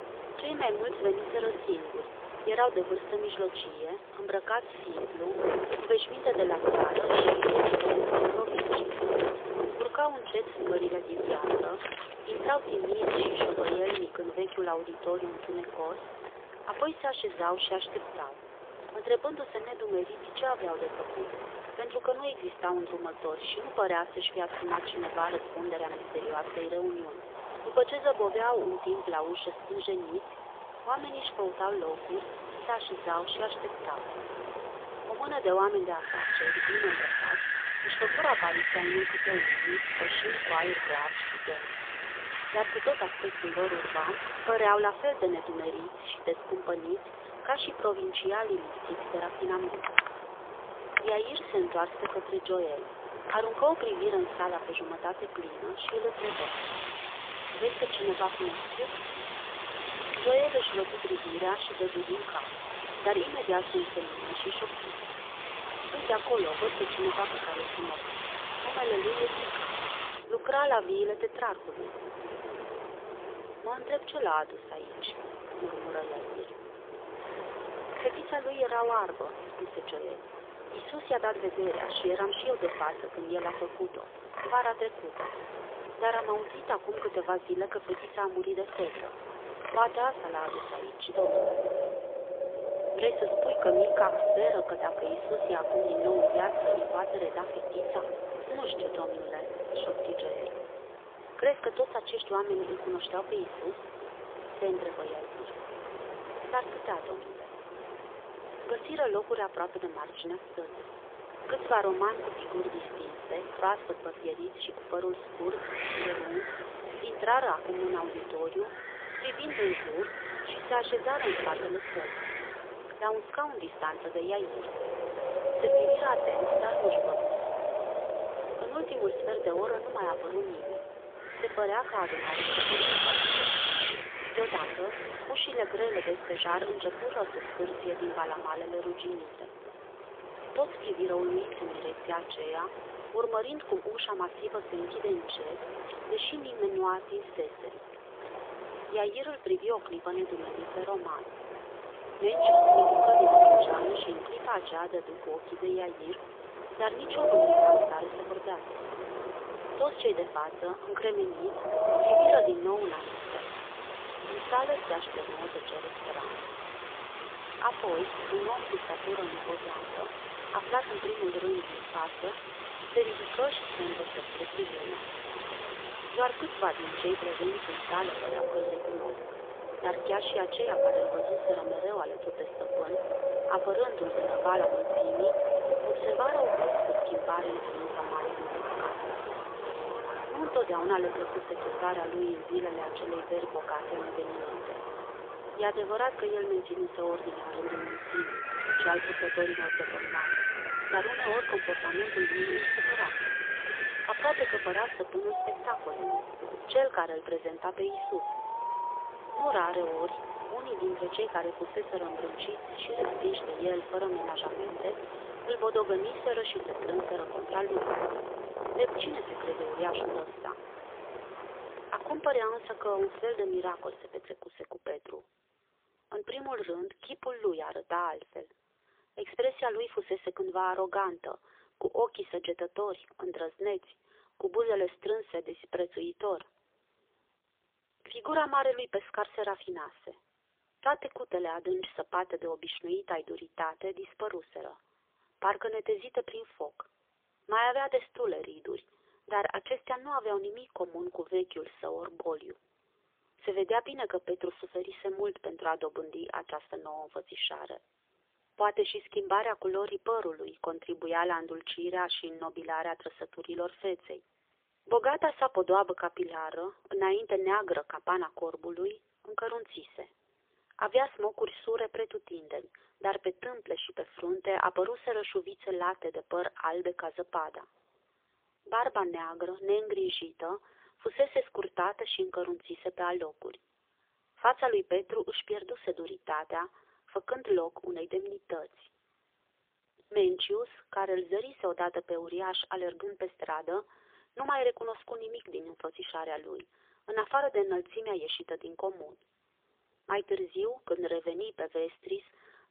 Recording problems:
phone-call audio; poor line; nothing above 3.5 kHz
wind in the background; very loud; until 3:44; 1 dB above the speech

